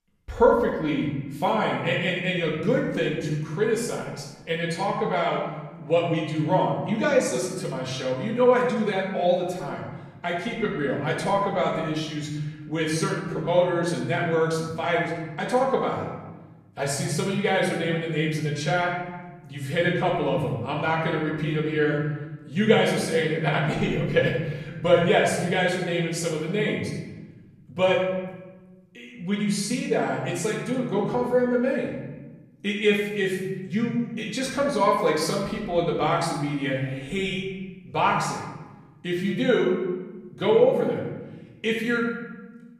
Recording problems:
off-mic speech; far
room echo; noticeable; dies away in 1.1 s

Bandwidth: 14.5 kHz